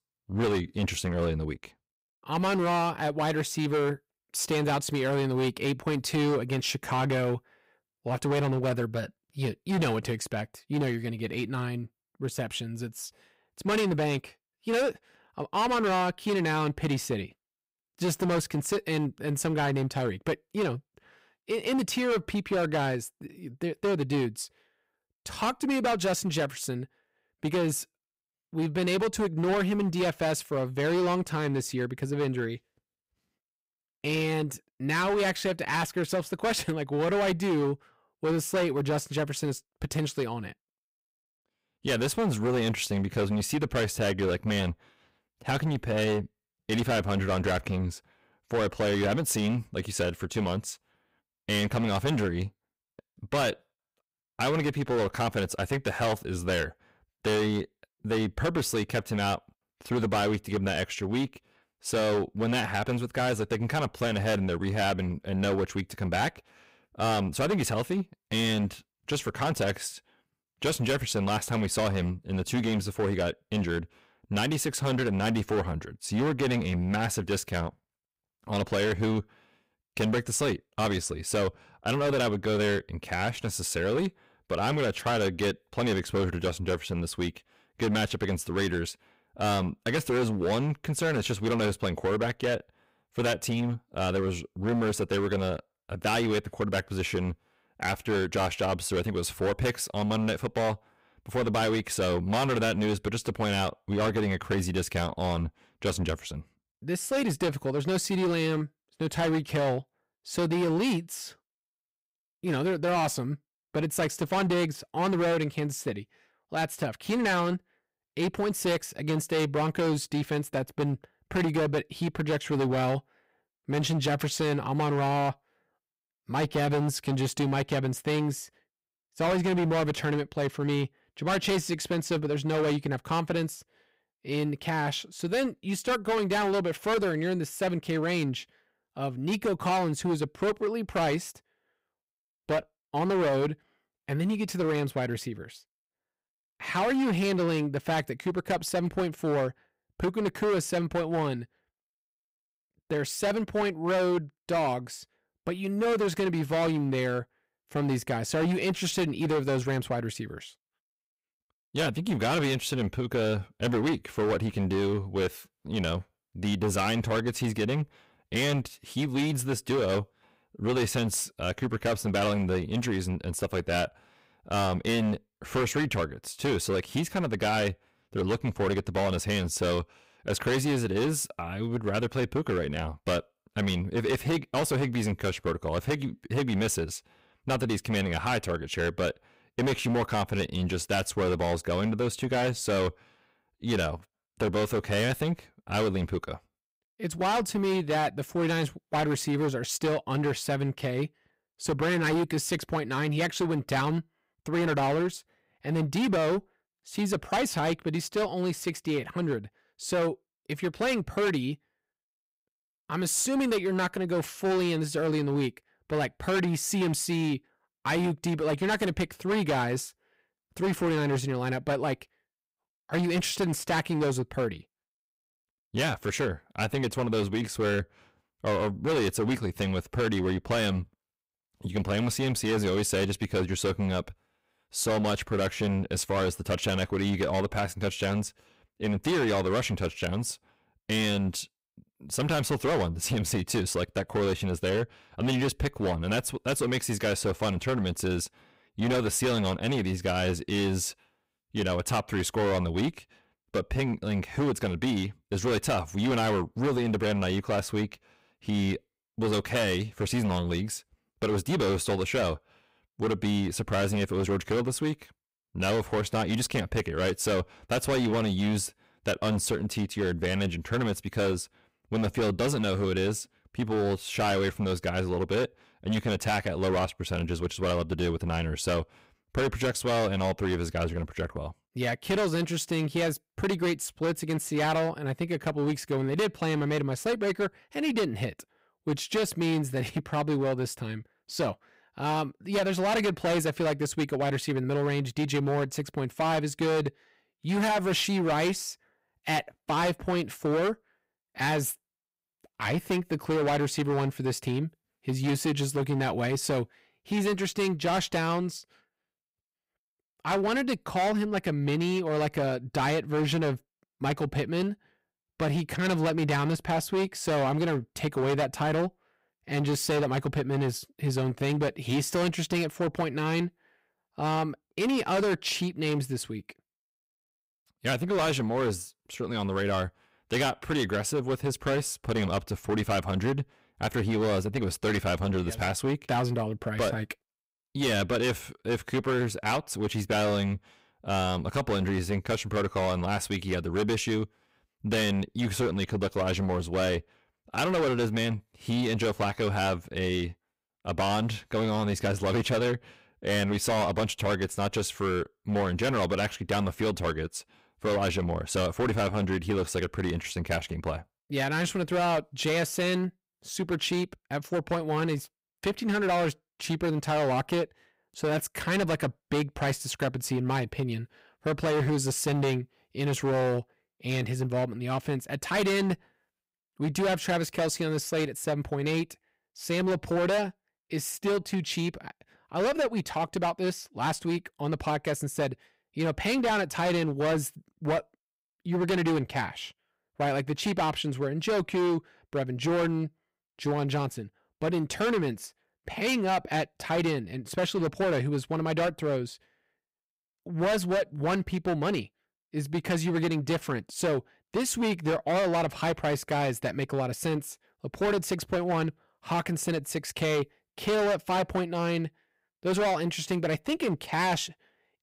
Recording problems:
distortion; heavy; 14% of the sound clipped

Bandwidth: 15.5 kHz